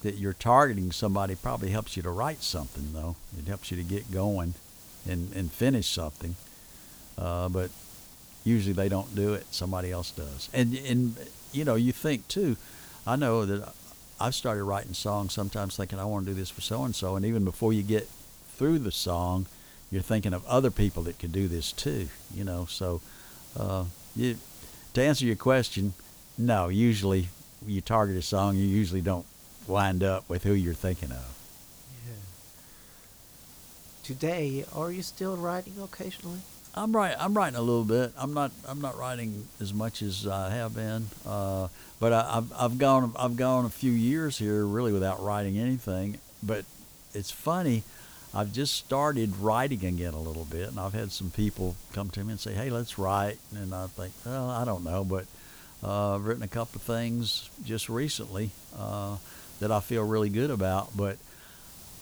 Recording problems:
hiss; noticeable; throughout; 20 dB below the speech

